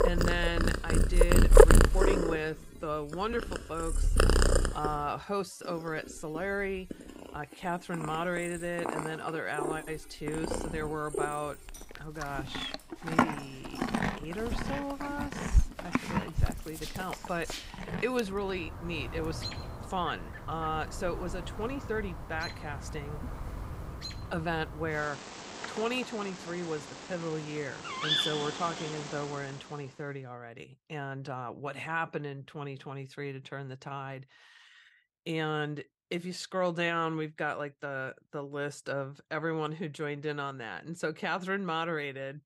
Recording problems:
animal sounds; very loud; until 30 s; 4 dB above the speech

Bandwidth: 15.5 kHz